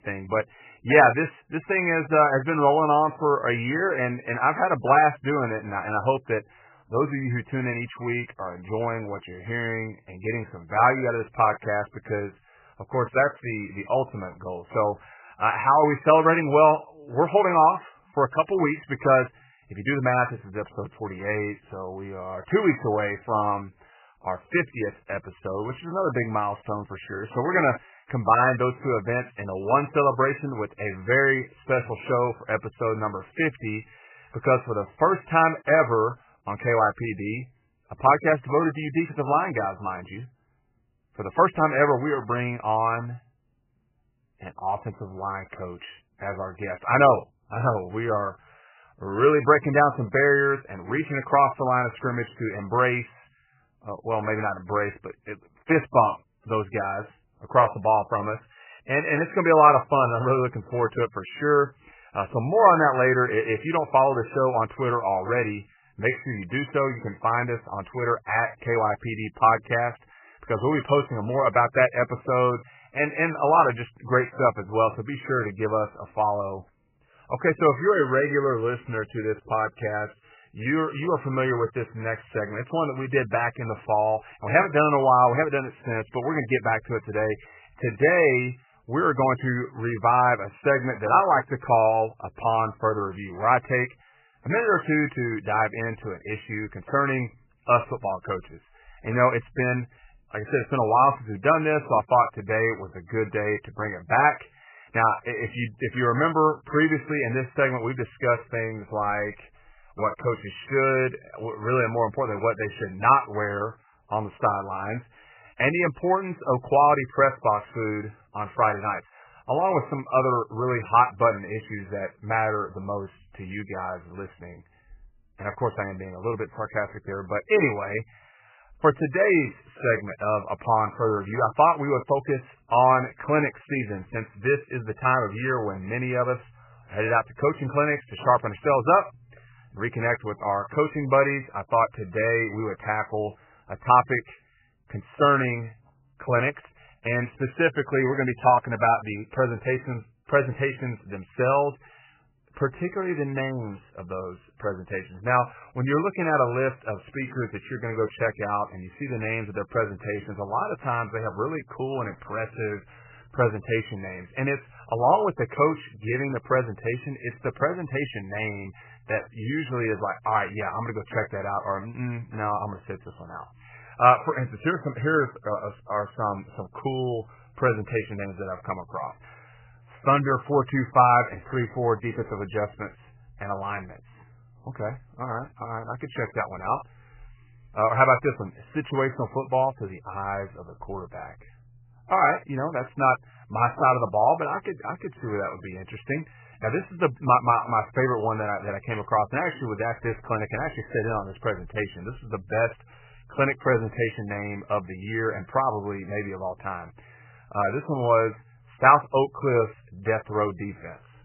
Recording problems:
garbled, watery; badly; nothing above 2.5 kHz

